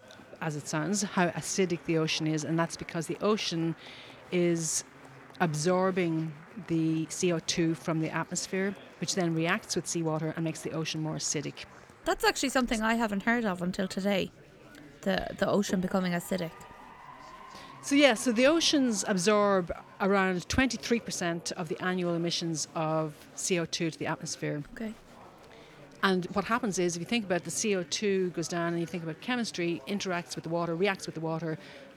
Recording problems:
chatter from many people; faint; throughout; 20 dB below the speech
uneven, jittery; strongly; from 7 to 31 s

